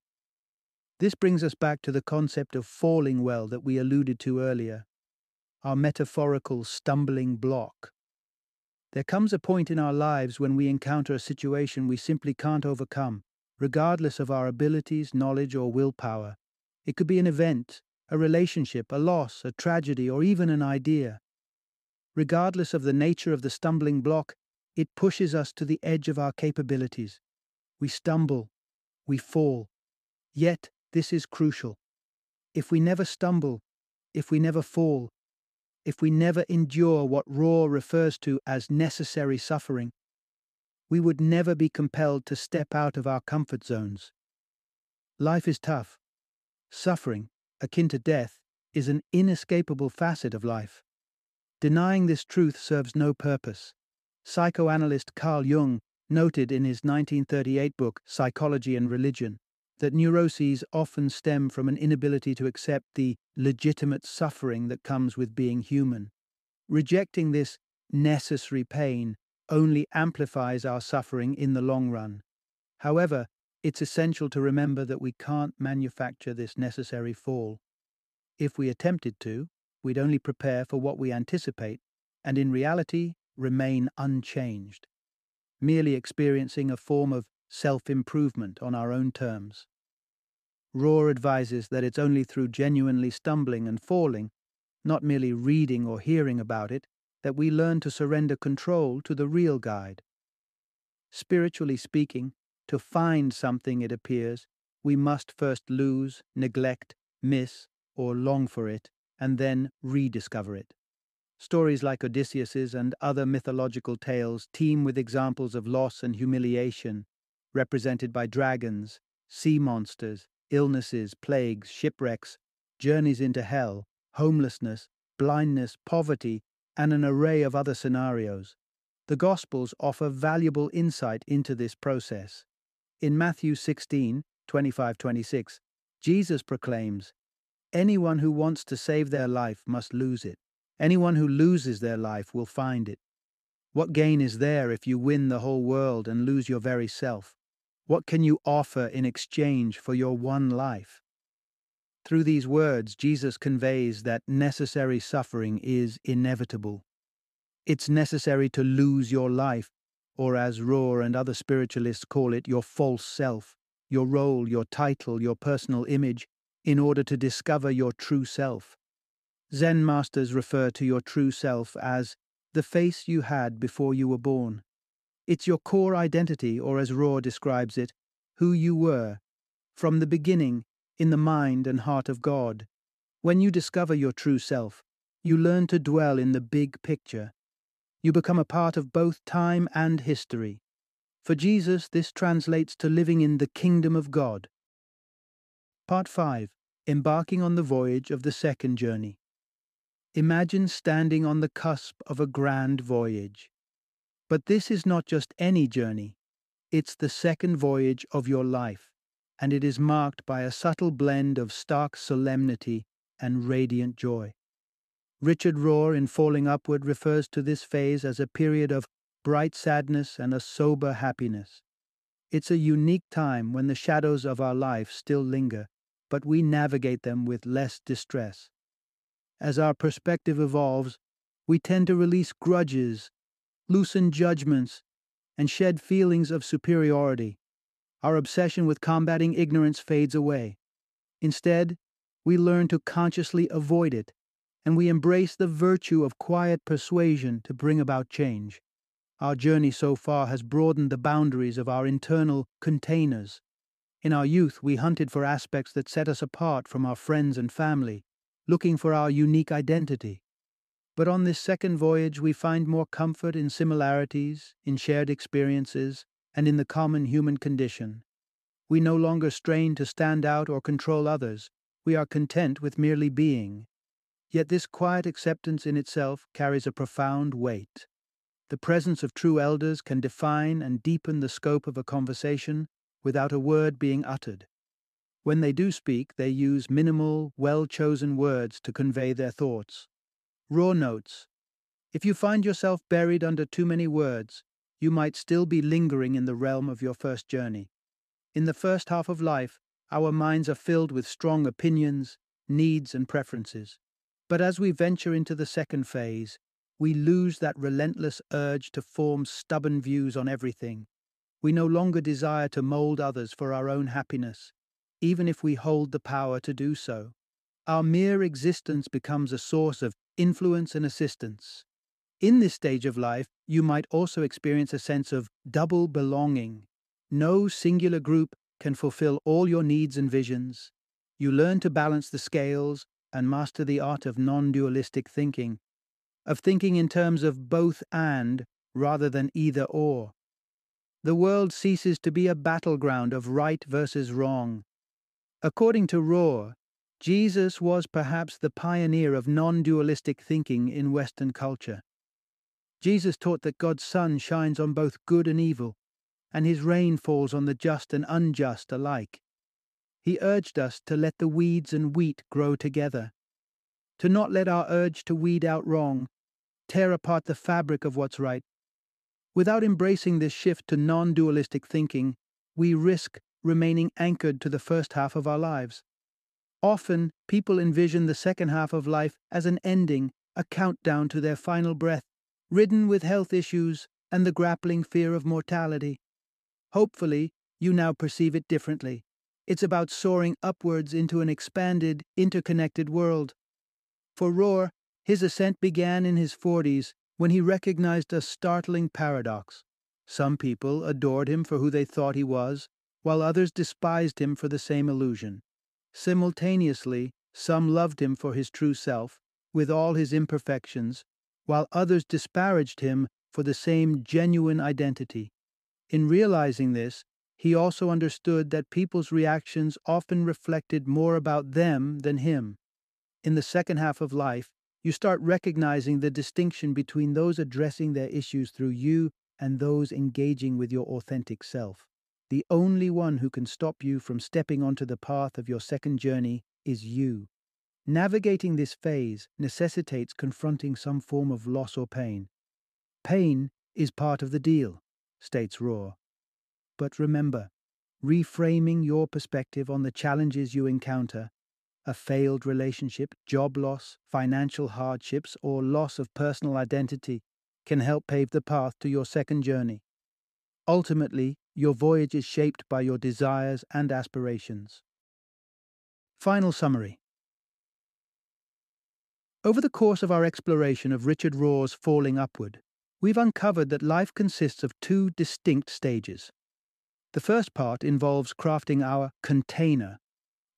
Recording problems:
none

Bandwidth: 14.5 kHz